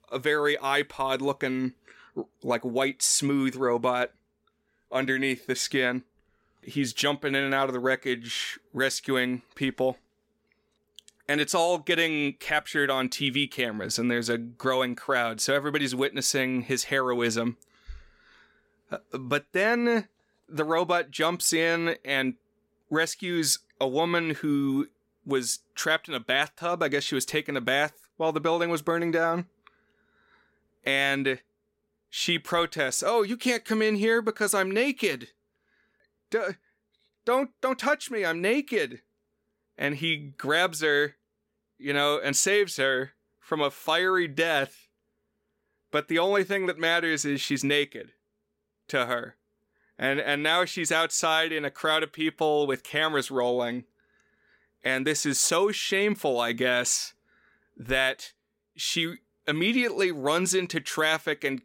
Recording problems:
none

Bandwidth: 16.5 kHz